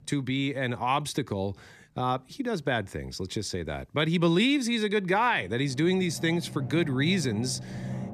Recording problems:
background music; noticeable; throughout; 10 dB below the speech

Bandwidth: 14.5 kHz